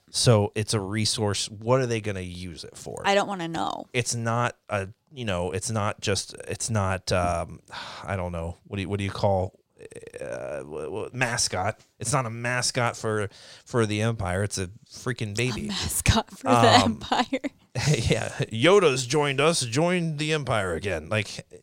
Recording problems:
none

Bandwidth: 16 kHz